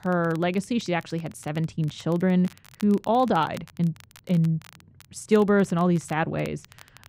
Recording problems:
muffled; very; fading above 3 kHz
crackle, like an old record; faint; 25 dB below the speech

